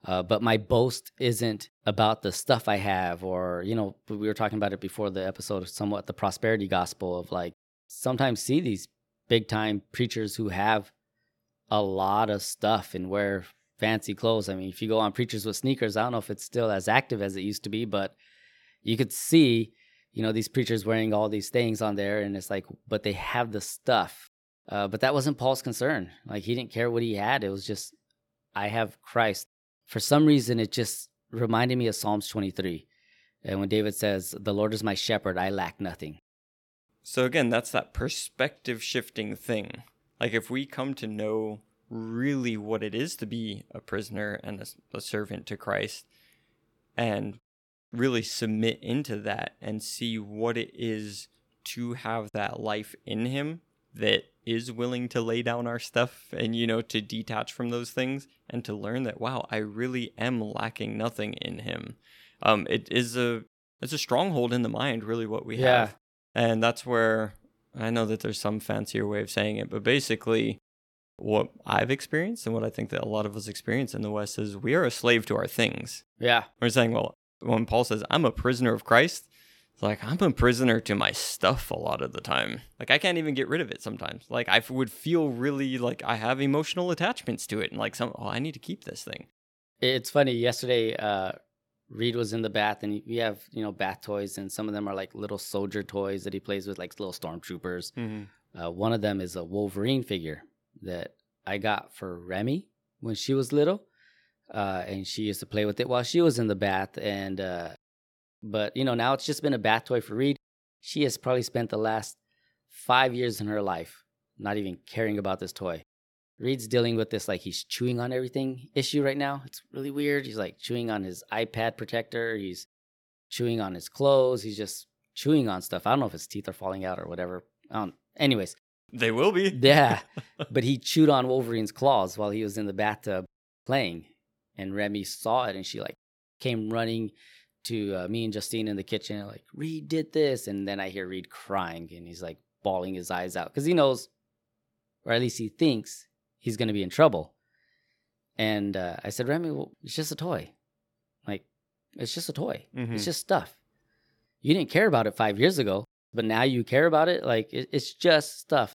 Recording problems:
none

